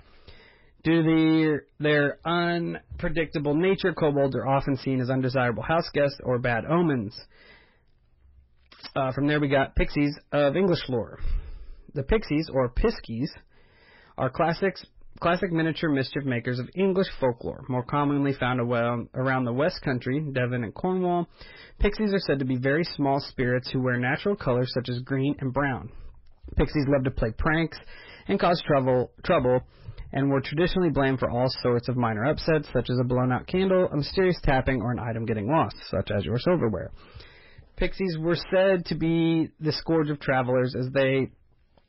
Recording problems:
garbled, watery; badly; nothing above 5.5 kHz
distortion; slight; 10 dB below the speech

